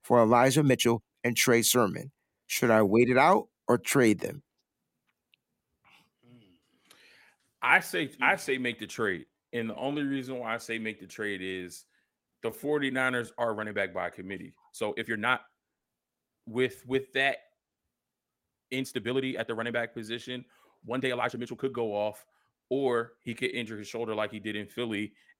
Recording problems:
uneven, jittery; strongly; from 0.5 to 24 s

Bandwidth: 16.5 kHz